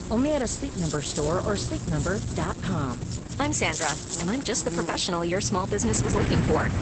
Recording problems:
garbled, watery; badly; nothing above 8 kHz
electrical hum; noticeable; throughout; 60 Hz, 10 dB below the speech
wind noise on the microphone; occasional gusts; 10 dB below the speech
low rumble; noticeable; from 1 to 3.5 s and from 5.5 s on; 15 dB below the speech
train or aircraft noise; faint; throughout; 20 dB below the speech

